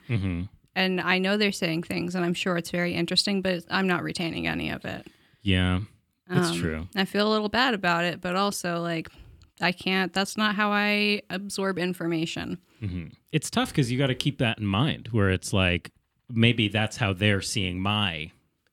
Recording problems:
none

